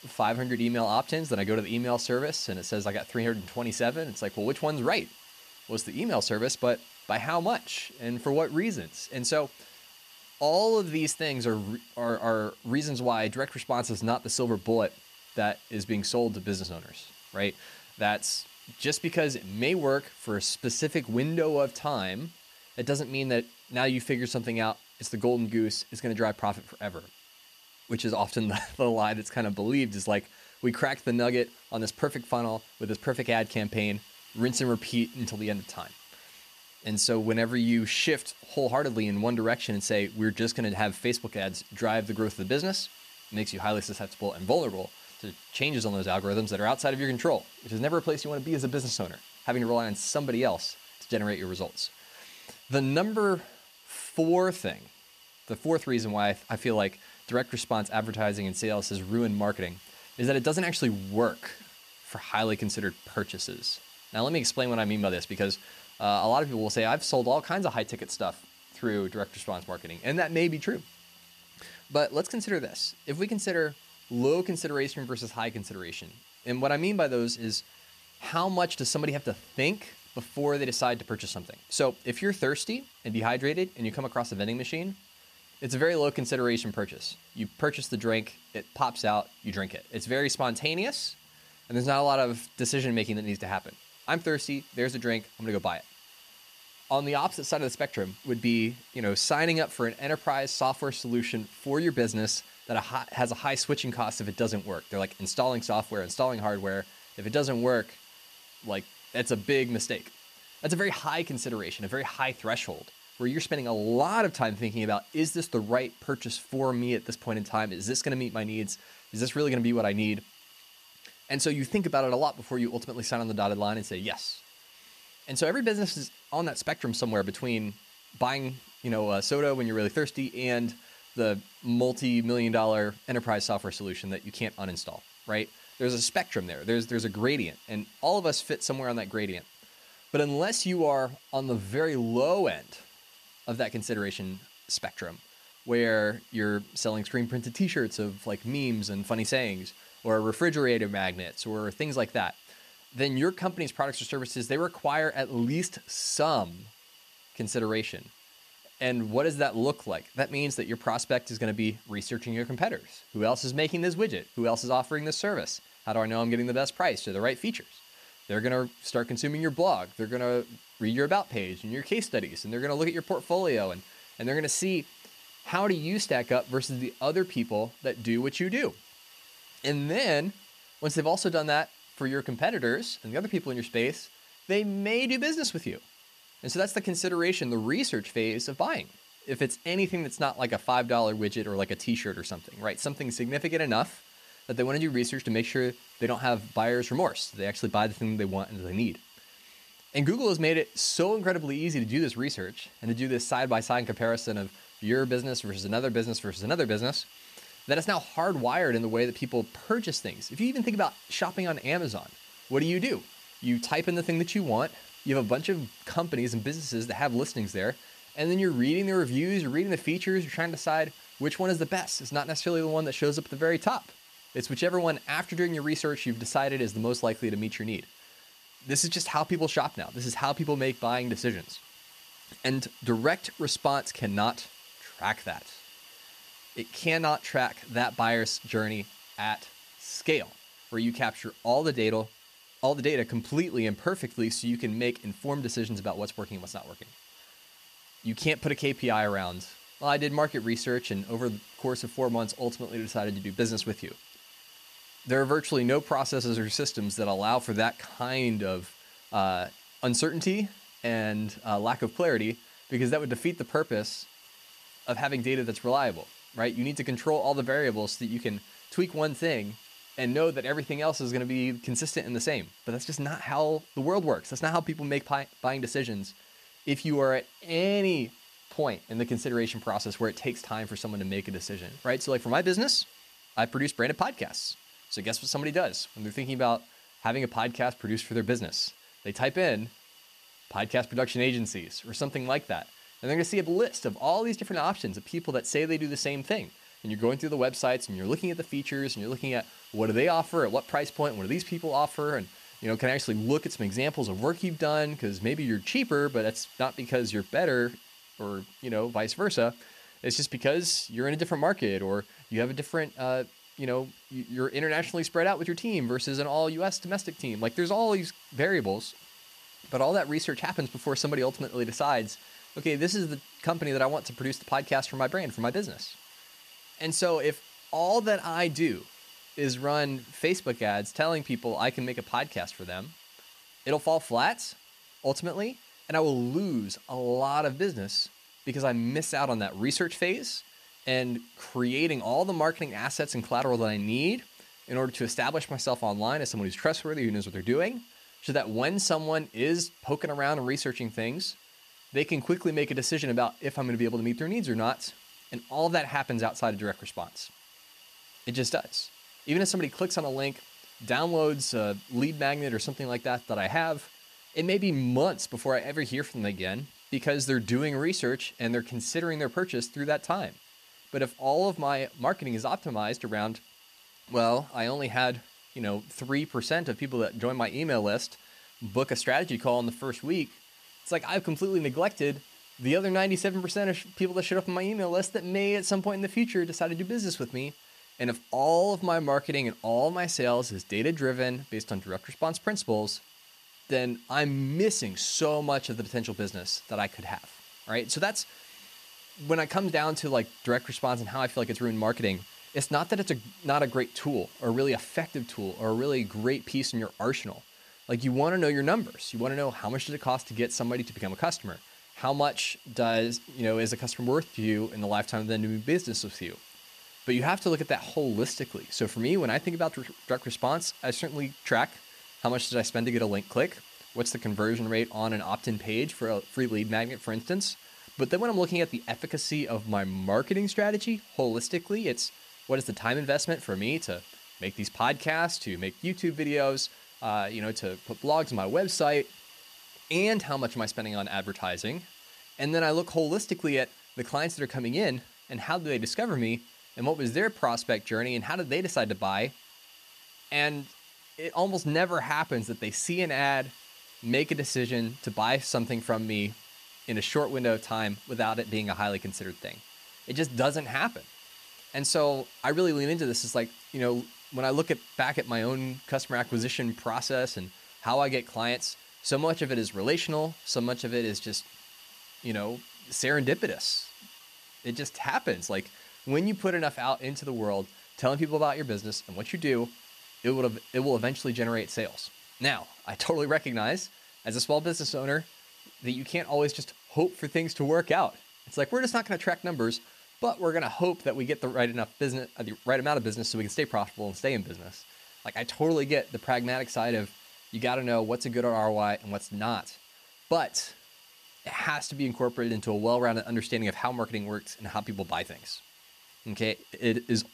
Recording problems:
hiss; faint; throughout; 20 dB below the speech

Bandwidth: 14.5 kHz